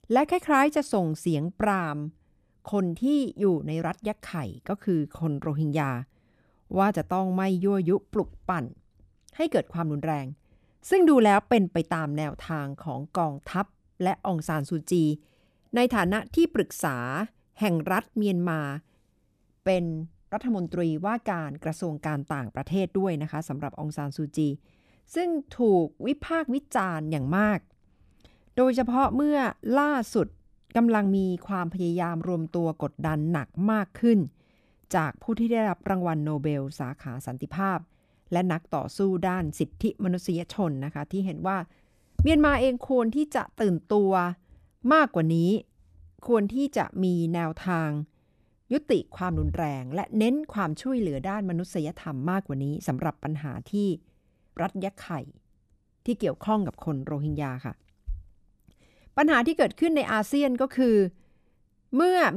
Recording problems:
abrupt cut into speech; at the end

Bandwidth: 14.5 kHz